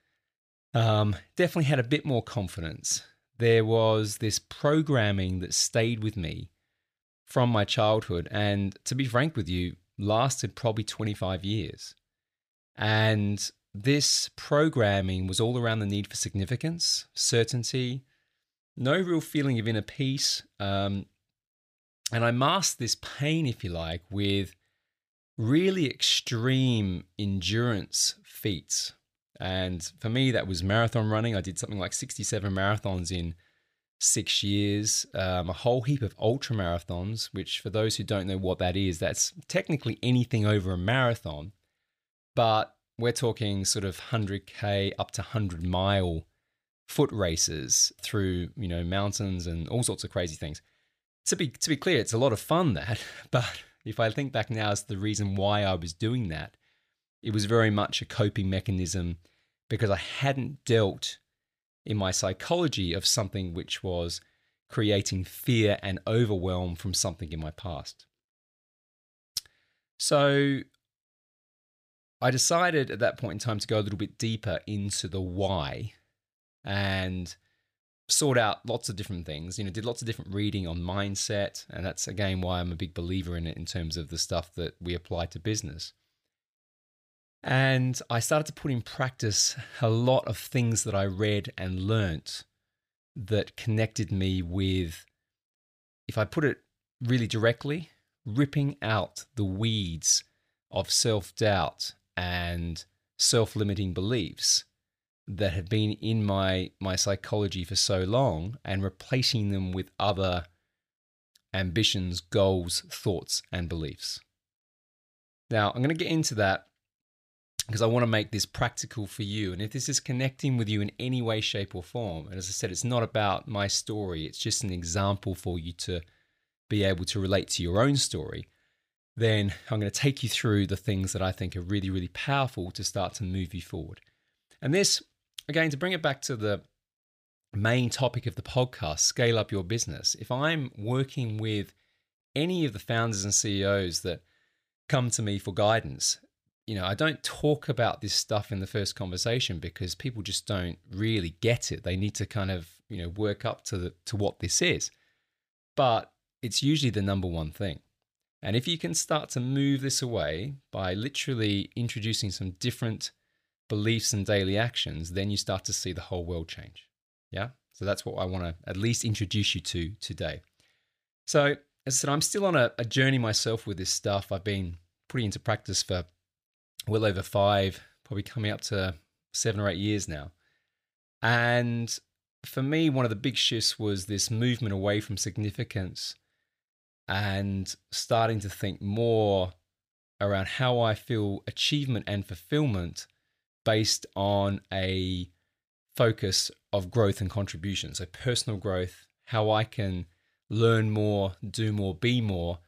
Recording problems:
none

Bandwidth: 15 kHz